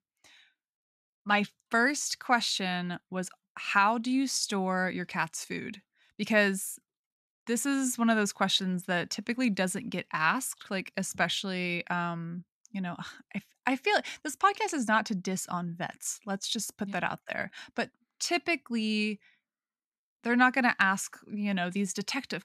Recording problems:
none

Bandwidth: 14 kHz